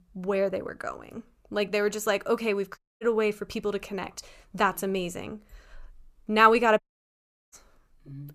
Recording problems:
audio cutting out; at 3 s and at 7 s for 0.5 s

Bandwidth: 14.5 kHz